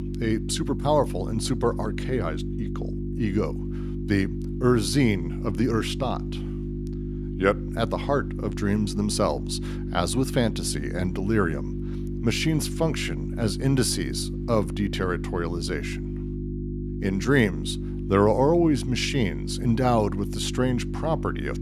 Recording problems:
electrical hum; noticeable; throughout; 50 Hz, 10 dB below the speech

